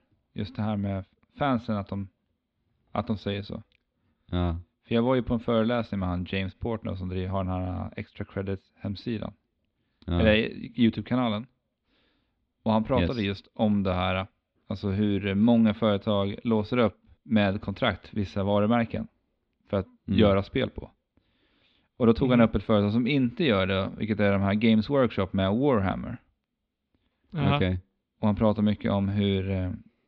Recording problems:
muffled; slightly; fading above 4 kHz

